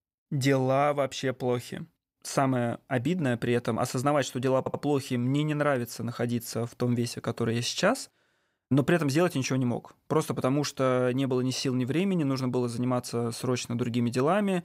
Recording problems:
audio stuttering; at 4.5 s

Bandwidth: 15.5 kHz